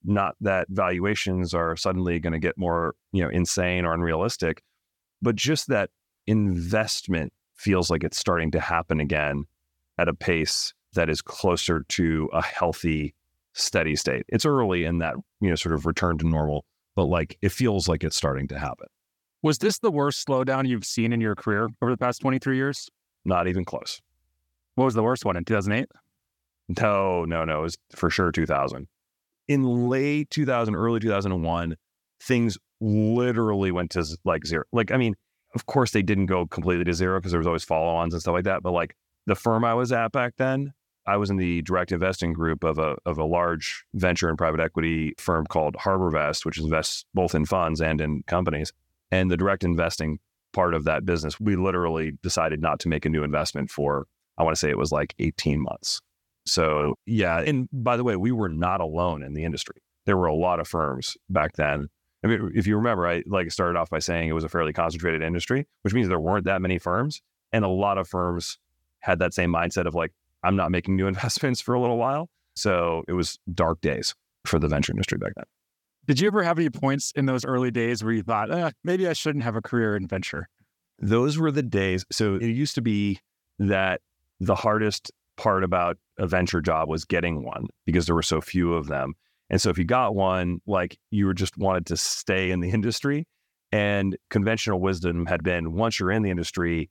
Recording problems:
none

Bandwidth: 17.5 kHz